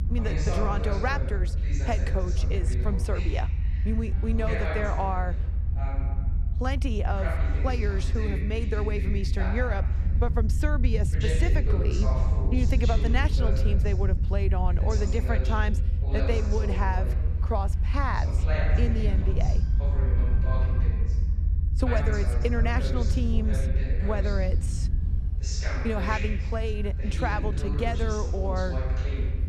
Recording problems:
voice in the background; loud; throughout; 6 dB below the speech
low rumble; noticeable; throughout; 10 dB below the speech
train or aircraft noise; faint; throughout; 25 dB below the speech

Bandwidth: 13.5 kHz